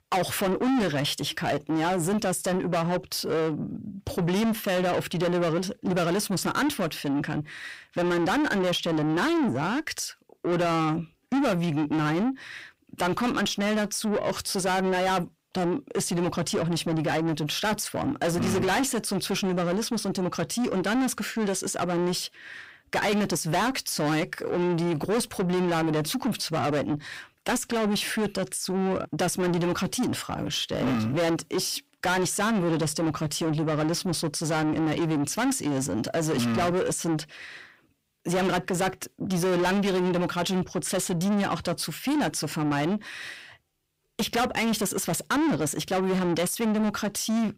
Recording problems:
distortion; heavy; 6 dB below the speech

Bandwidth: 15.5 kHz